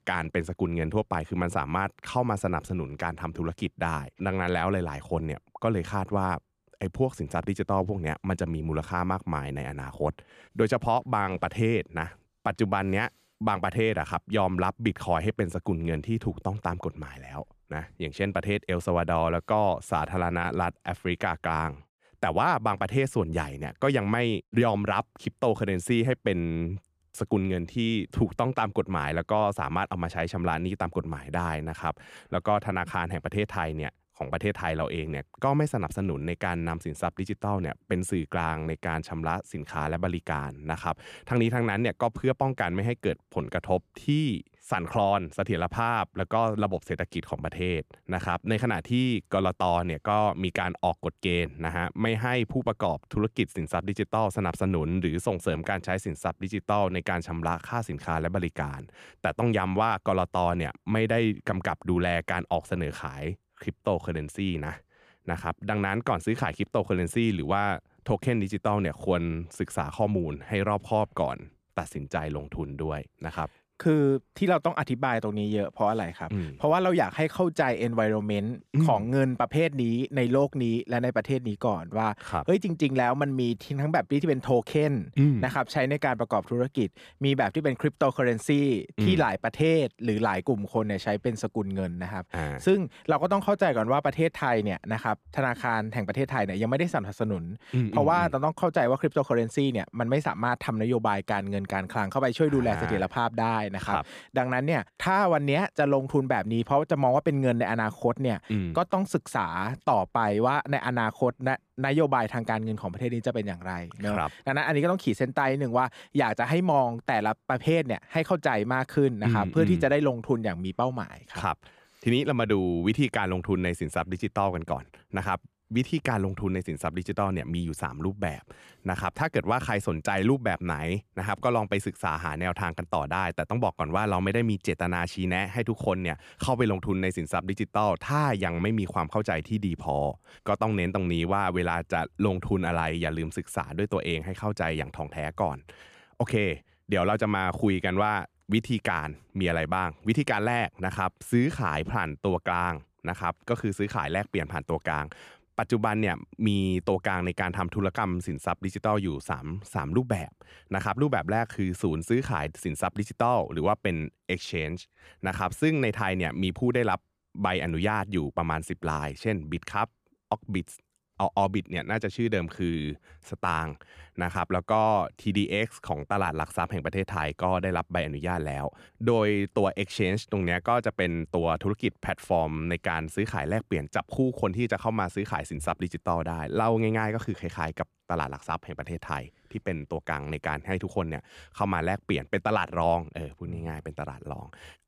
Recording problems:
none

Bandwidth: 14.5 kHz